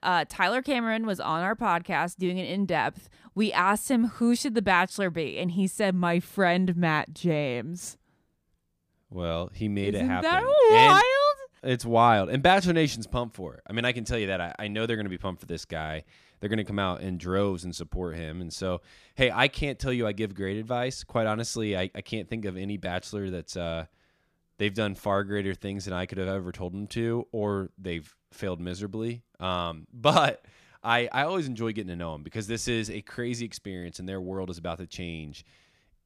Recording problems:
none

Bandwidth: 15 kHz